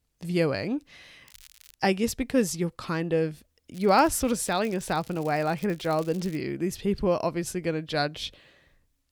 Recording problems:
crackling; faint; at 1 s and from 3.5 to 6.5 s; 25 dB below the speech

